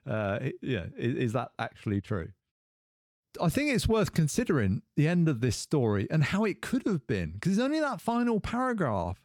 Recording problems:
none

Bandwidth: 18 kHz